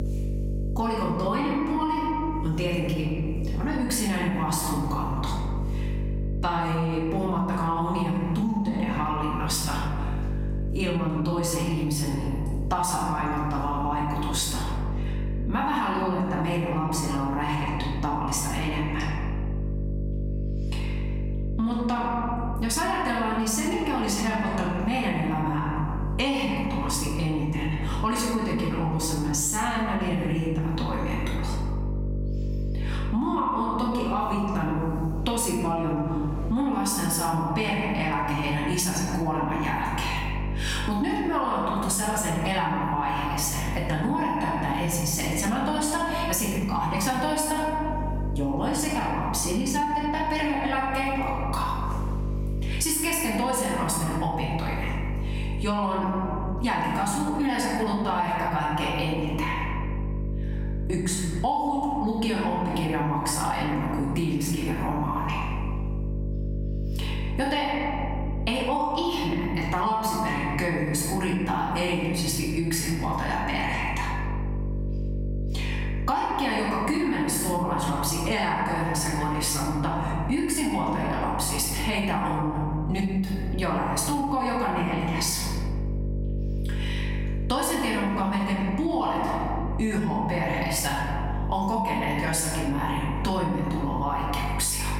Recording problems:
off-mic speech; far
squashed, flat; heavily
room echo; noticeable; dies away in 1.2 s
electrical hum; noticeable; throughout; 50 Hz, 20 dB below the speech

